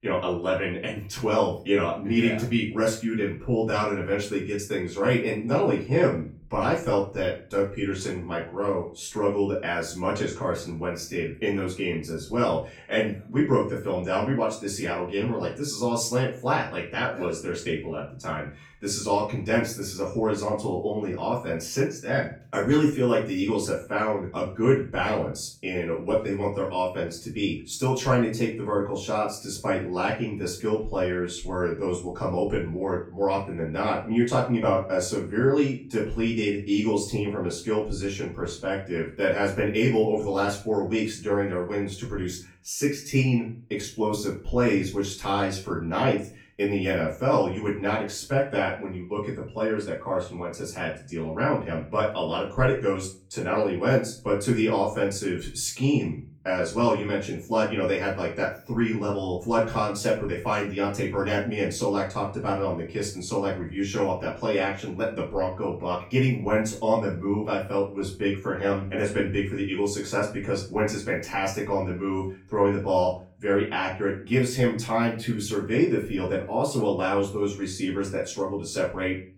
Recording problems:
off-mic speech; far
room echo; slight; dies away in 0.3 s

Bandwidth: 17 kHz